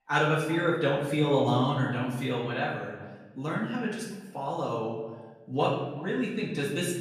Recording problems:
off-mic speech; far
room echo; noticeable; dies away in 0.9 s
echo of what is said; faint; throughout; 380 ms later, 20 dB below the speech

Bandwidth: 15 kHz